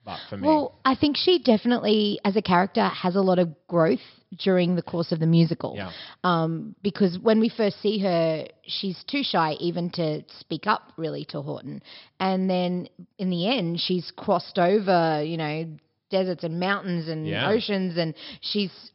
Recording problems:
high frequencies cut off; noticeable; nothing above 5.5 kHz

